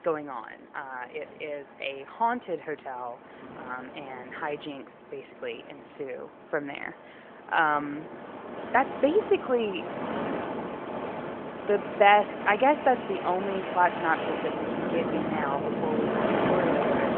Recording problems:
phone-call audio
wind in the background; loud; throughout; 3 dB below the speech

